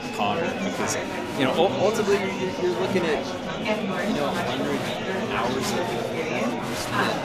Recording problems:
murmuring crowd; very loud; throughout; 1 dB above the speech

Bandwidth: 14.5 kHz